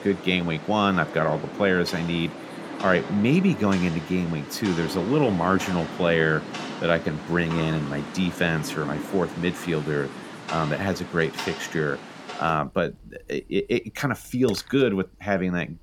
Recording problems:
rain or running water; noticeable; throughout; 10 dB below the speech

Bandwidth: 17 kHz